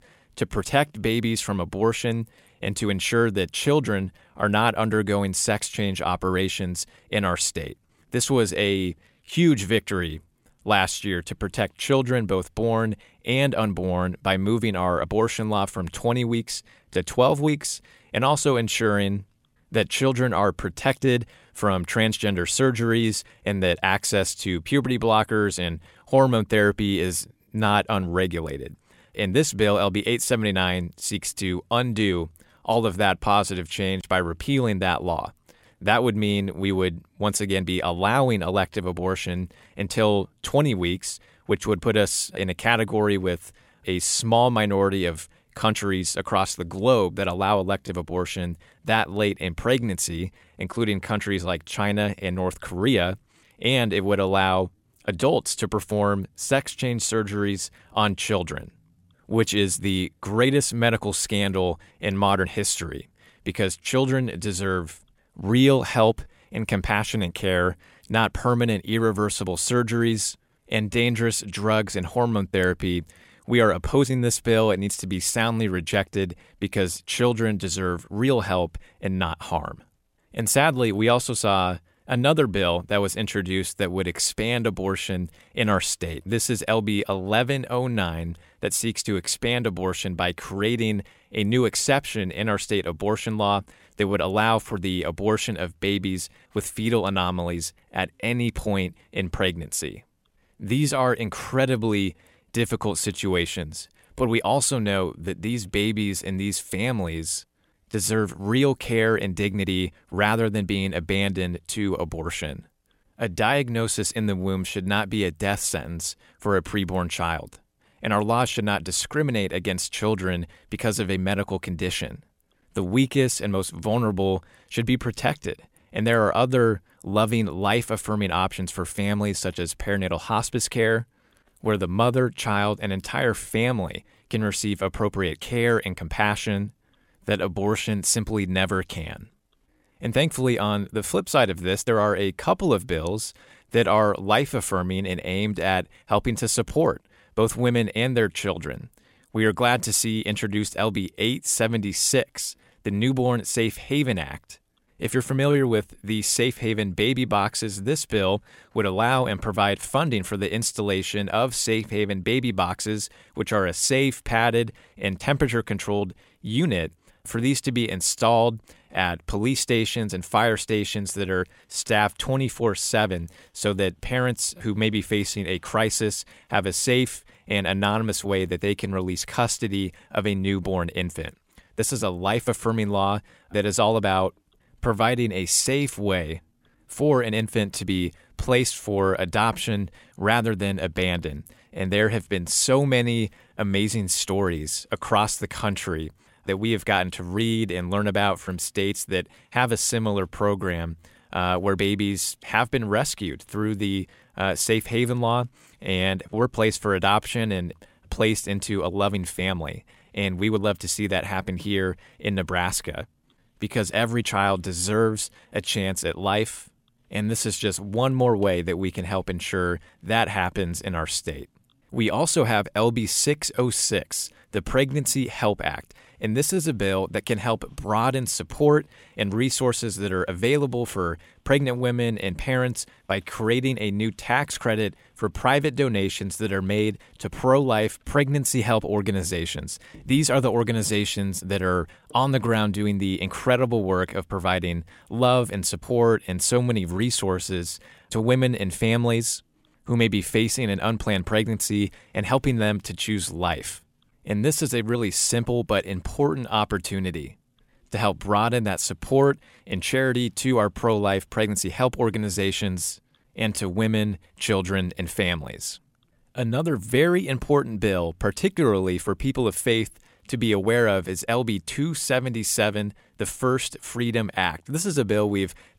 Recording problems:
none

